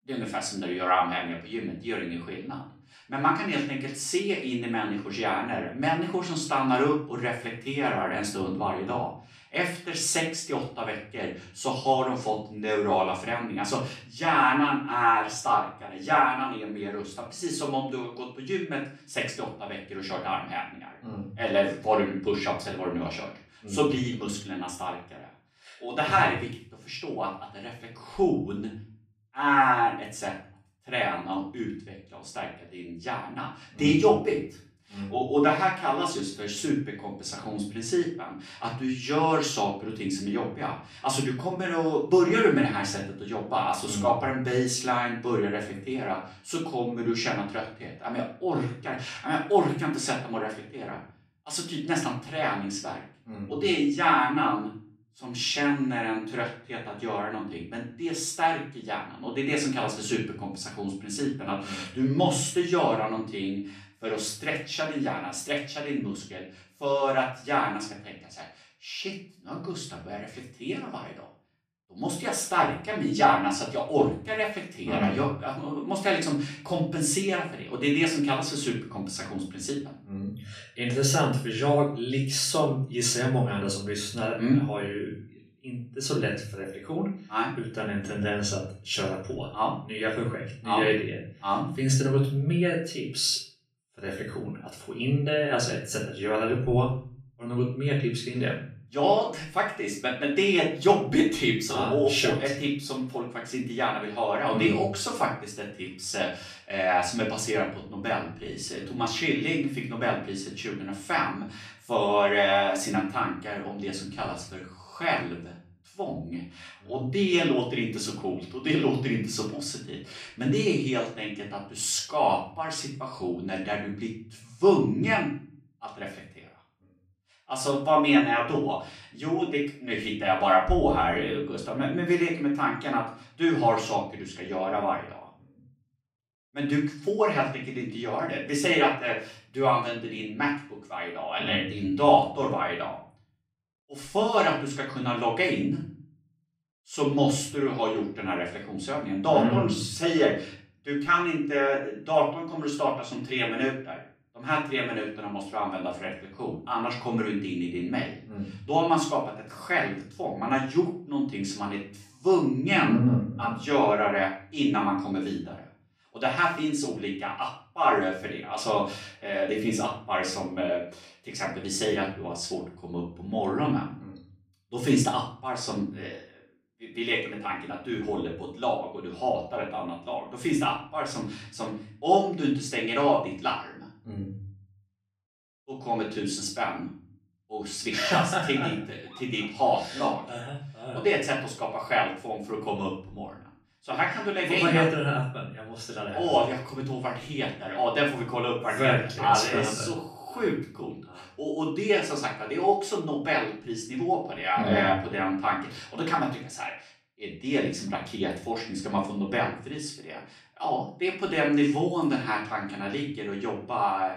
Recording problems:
off-mic speech; far
room echo; slight; dies away in 0.5 s

